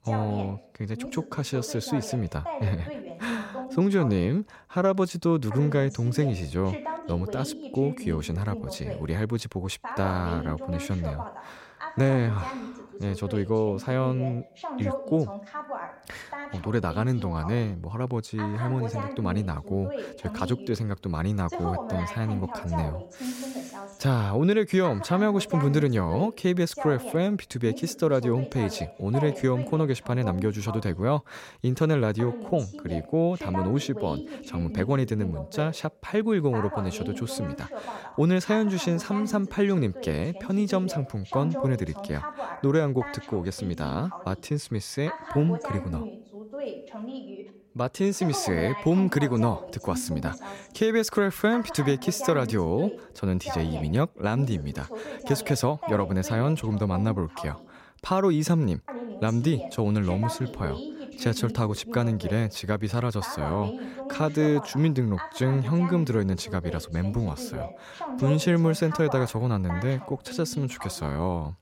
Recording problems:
voice in the background; noticeable; throughout; 10 dB below the speech

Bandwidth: 16 kHz